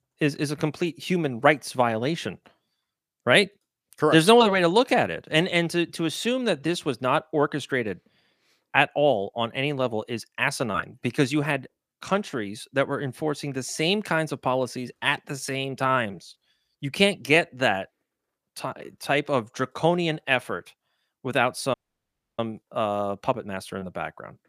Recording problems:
uneven, jittery; slightly; from 6.5 to 24 s
audio cutting out; at 22 s for 0.5 s

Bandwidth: 15 kHz